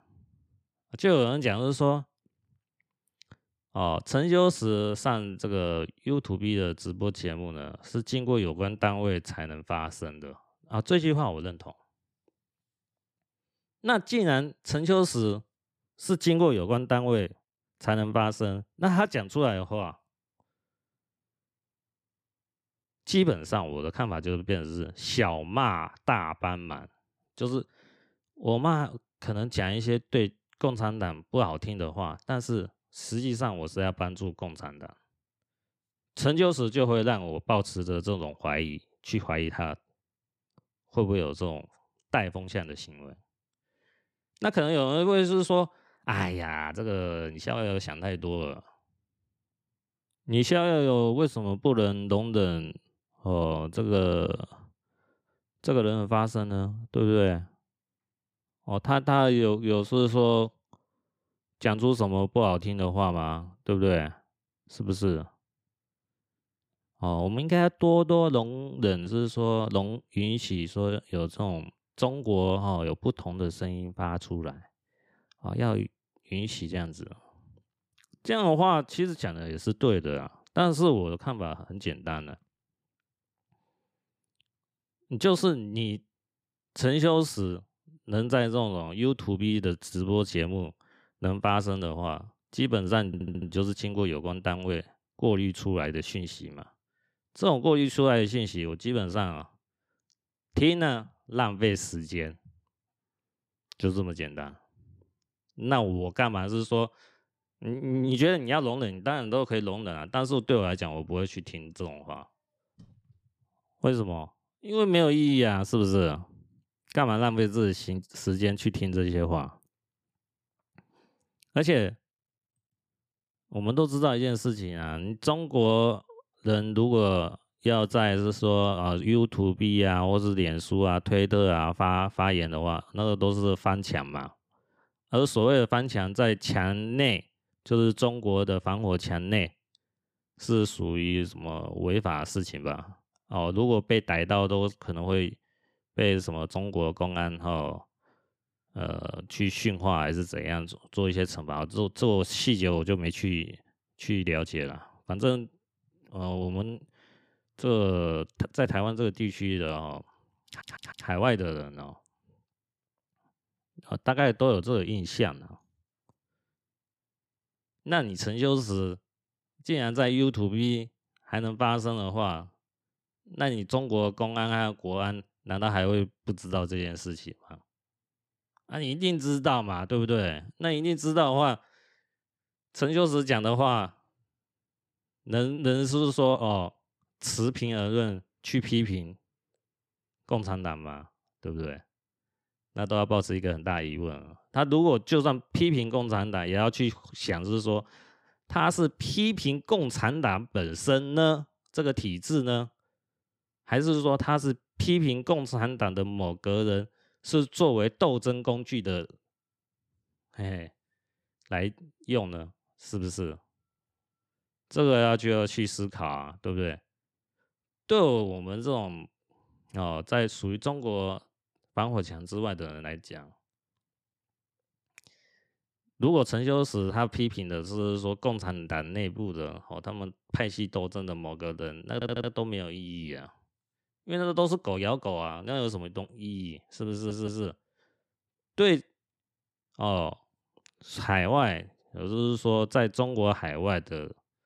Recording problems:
audio stuttering; 4 times, first at 1:33

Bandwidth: 15 kHz